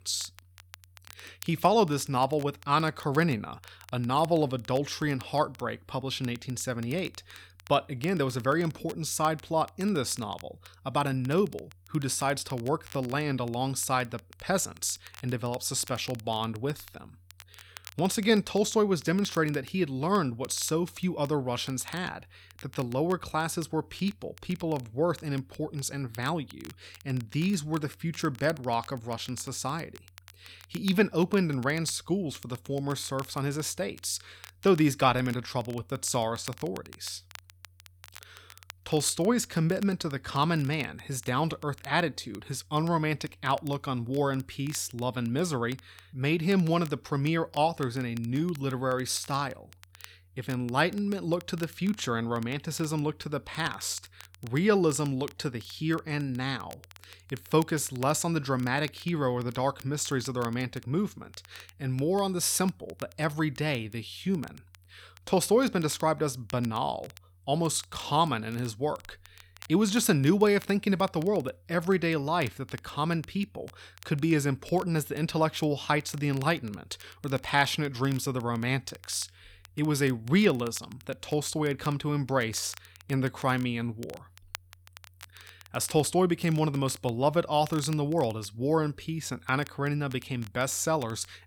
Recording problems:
crackle, like an old record; faint; 25 dB below the speech

